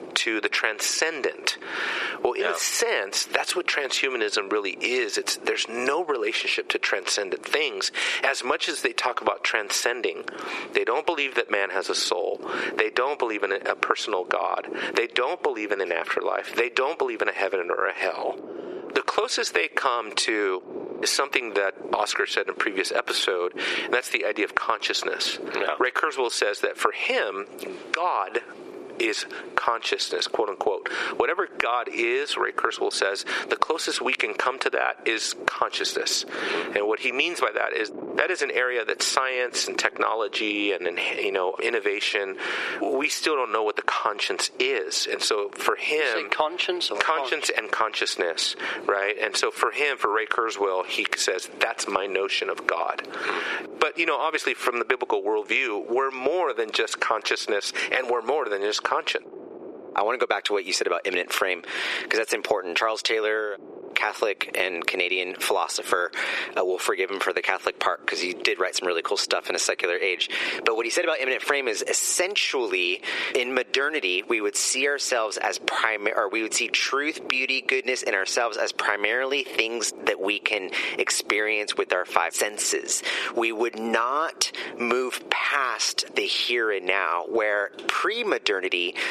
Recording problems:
thin; very; fading below 400 Hz
squashed, flat; heavily
wind noise on the microphone; occasional gusts; 20 dB below the speech

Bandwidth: 13.5 kHz